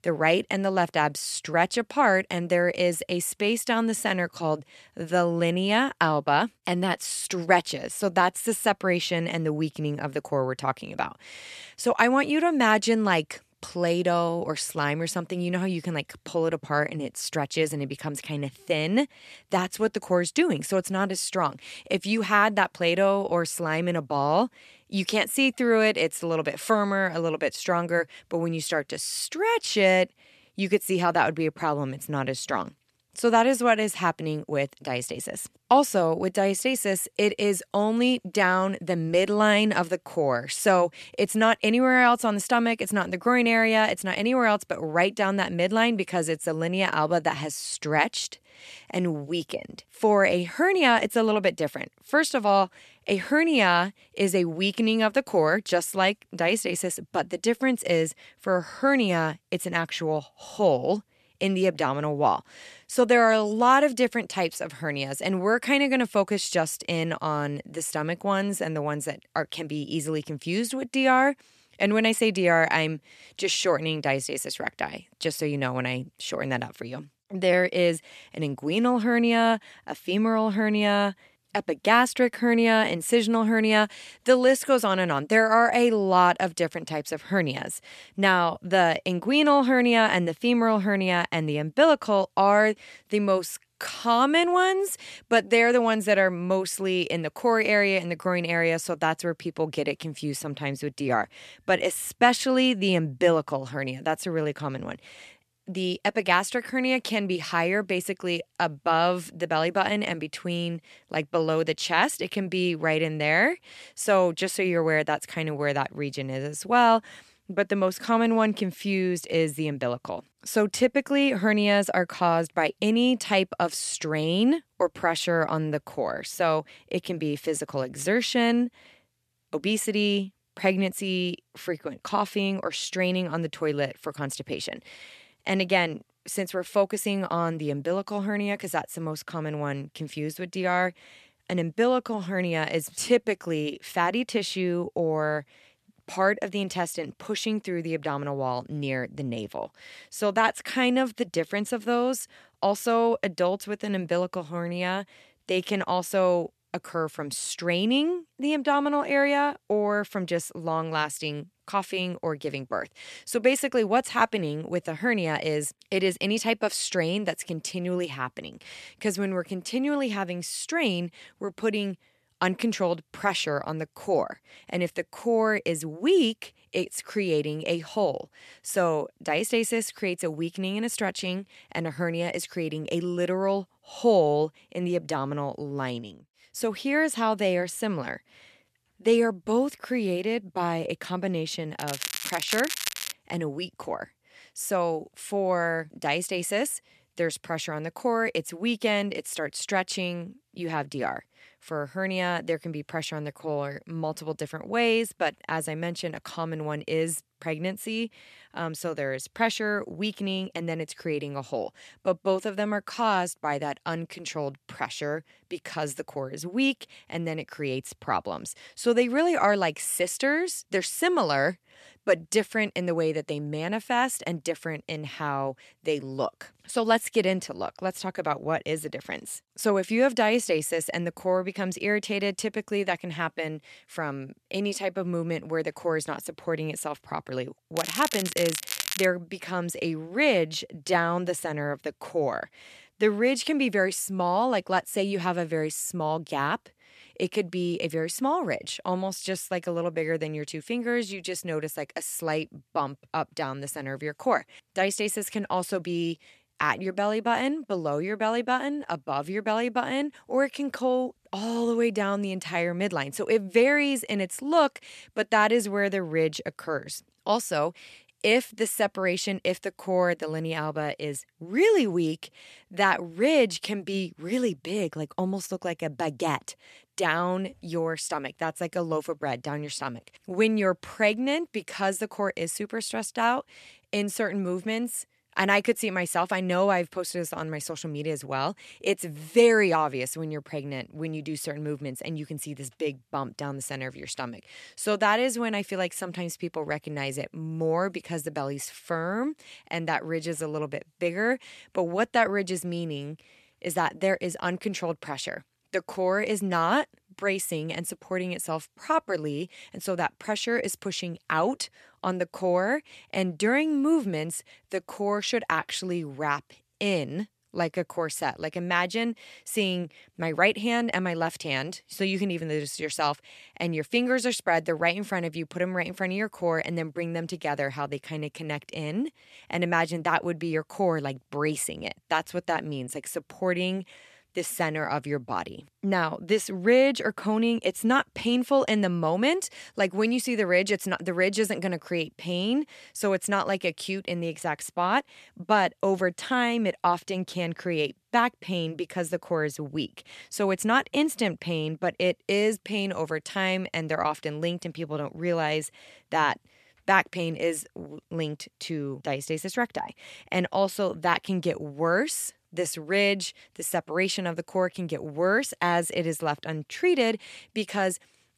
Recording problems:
crackling; loud; from 3:12 to 3:13 and from 3:58 to 3:59; 5 dB below the speech

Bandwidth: 13.5 kHz